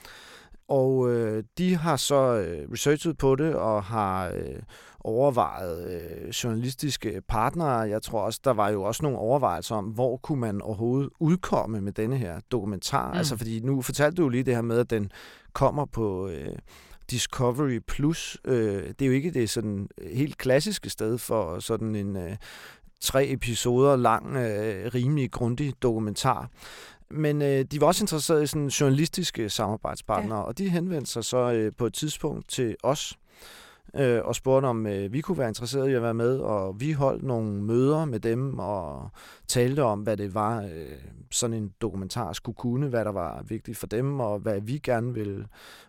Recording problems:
none

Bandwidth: 16.5 kHz